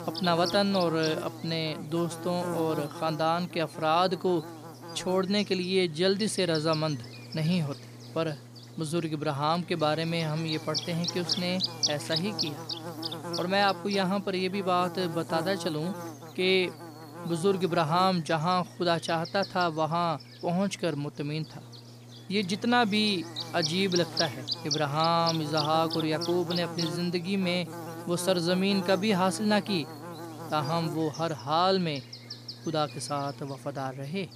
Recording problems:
electrical hum; loud; throughout; 60 Hz, 8 dB below the speech

